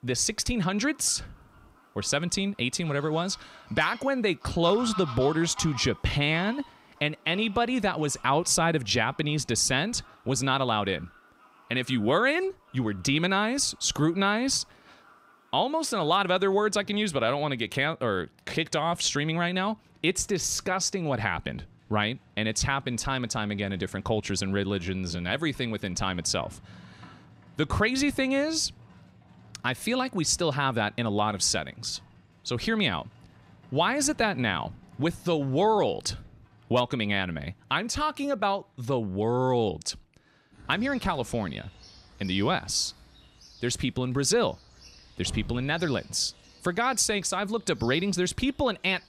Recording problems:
animal sounds; faint; throughout; 25 dB below the speech

